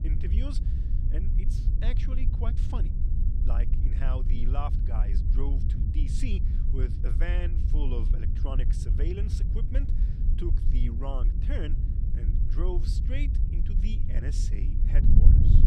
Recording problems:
wind noise on the microphone; heavy; 3 dB below the speech

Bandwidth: 14.5 kHz